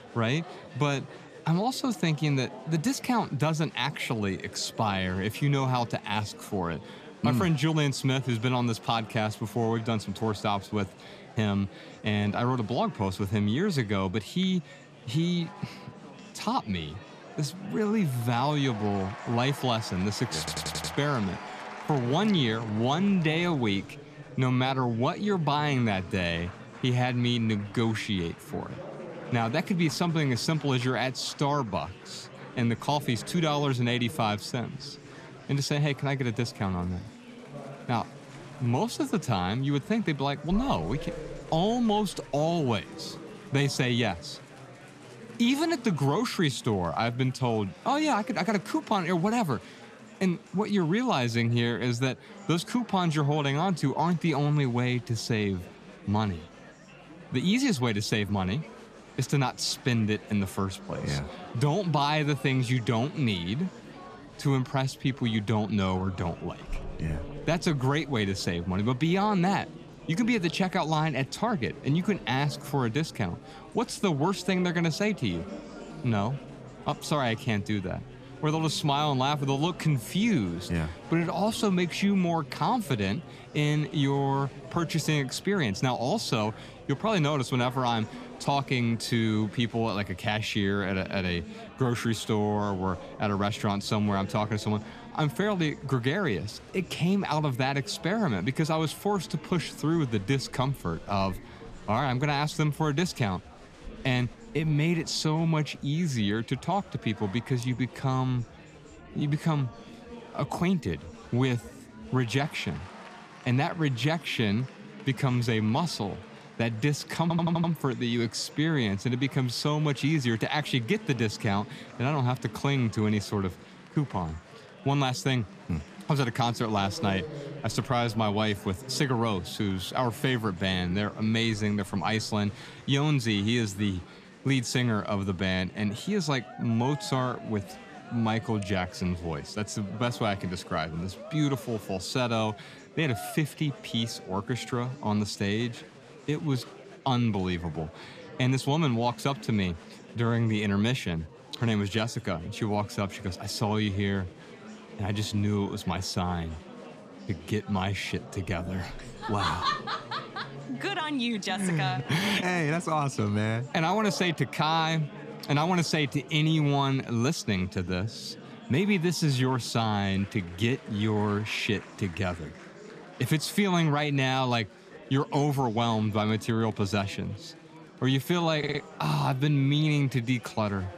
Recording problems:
chatter from many people; noticeable; throughout; 15 dB below the speech
audio stuttering; at 20 s, at 1:57 and at 2:59

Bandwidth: 14.5 kHz